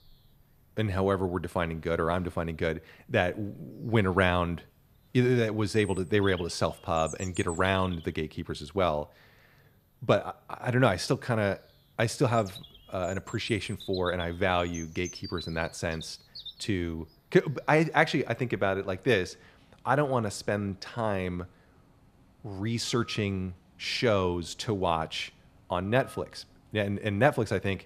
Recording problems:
animal sounds; noticeable; throughout; 15 dB below the speech

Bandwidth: 14 kHz